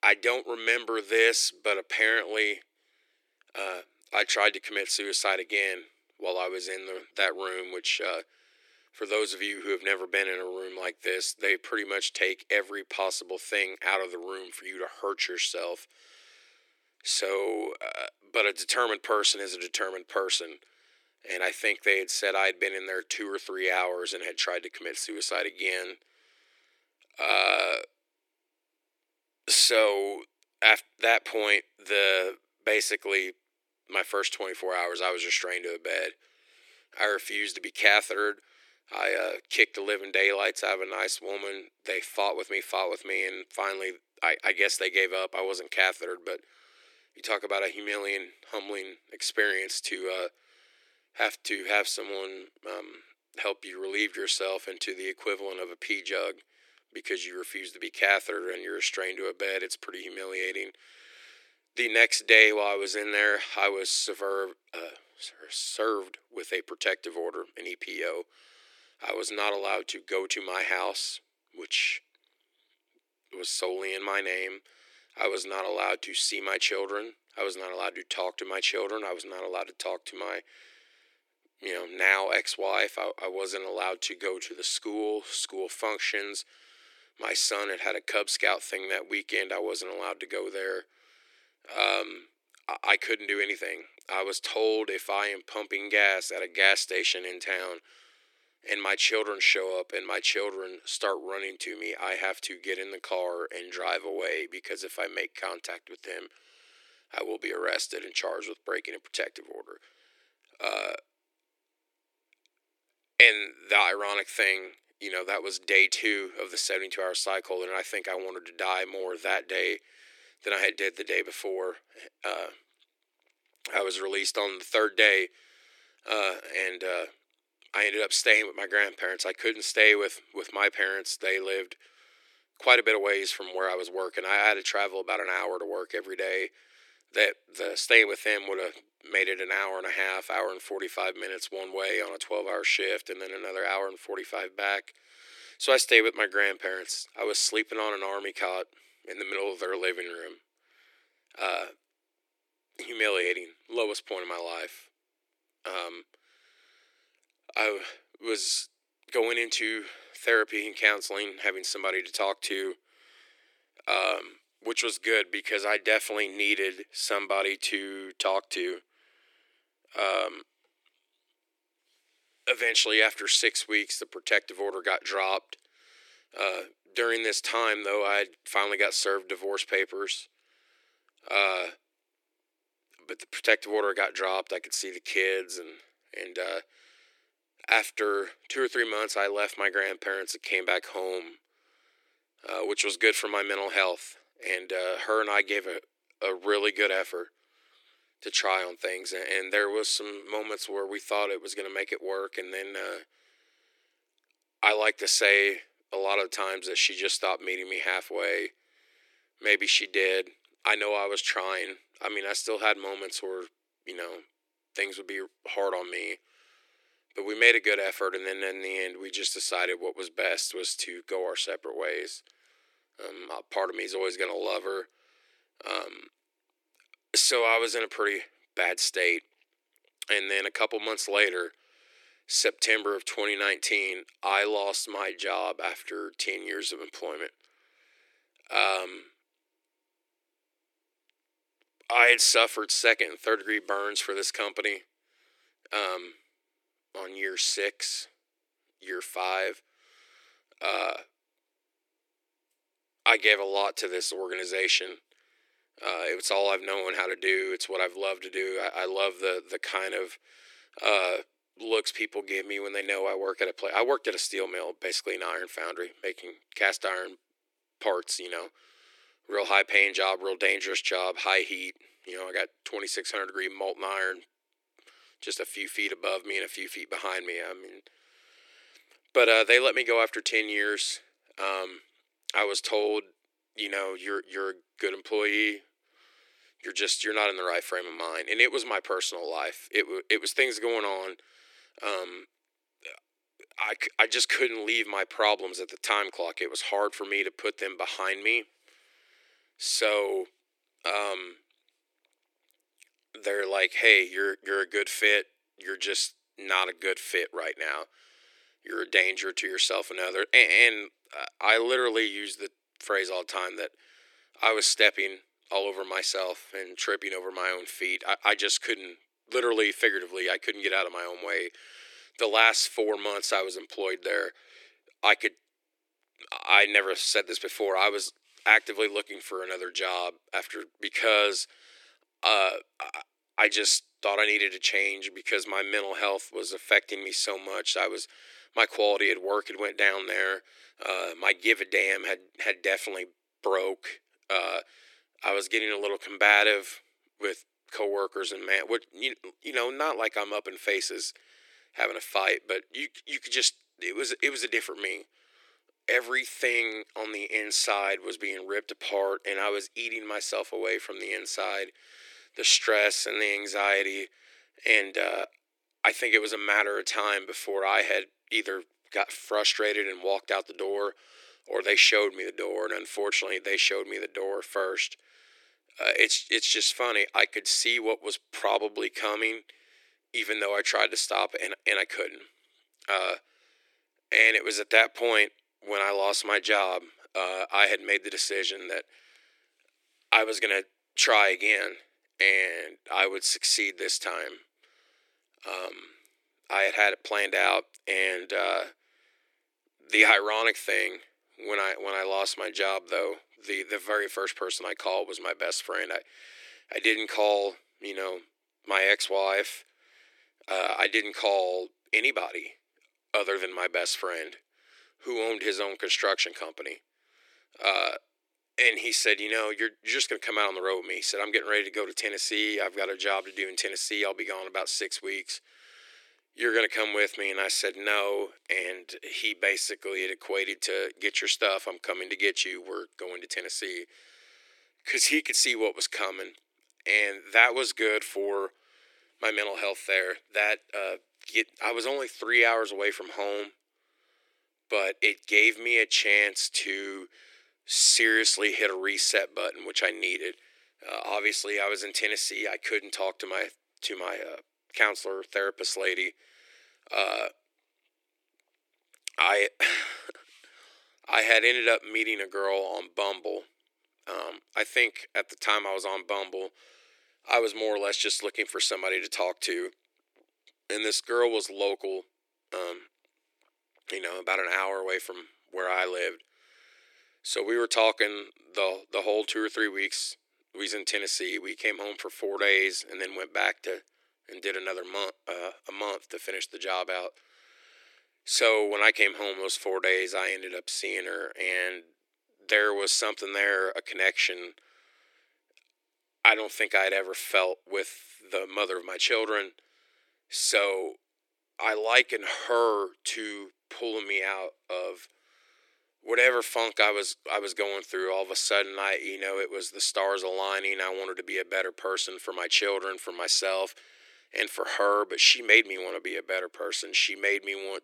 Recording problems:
thin; very; fading below 300 Hz

